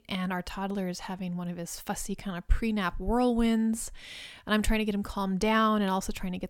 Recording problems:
none

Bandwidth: 17.5 kHz